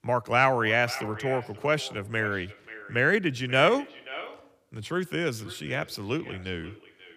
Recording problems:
echo of what is said; noticeable; throughout; 530 ms later, 15 dB below the speech

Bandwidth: 15 kHz